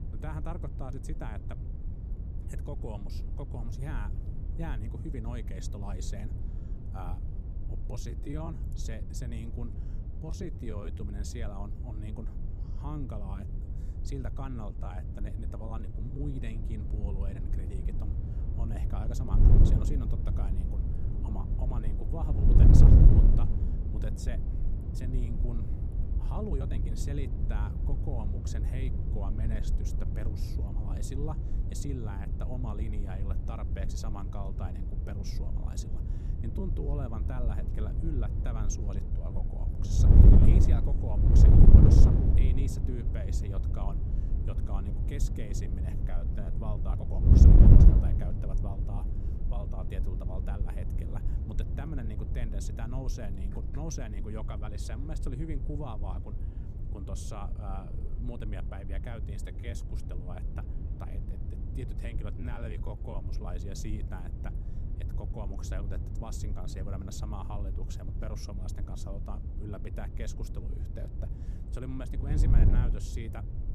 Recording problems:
wind noise on the microphone; heavy; 2 dB above the speech
uneven, jittery; strongly; from 8 s to 1:03

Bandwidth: 15 kHz